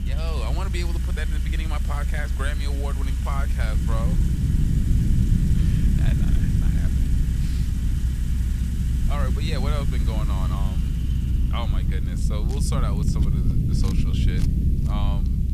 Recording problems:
household noises; loud; throughout; 8 dB below the speech
low rumble; loud; throughout; 2 dB below the speech
hiss; noticeable; throughout; 20 dB below the speech

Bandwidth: 14.5 kHz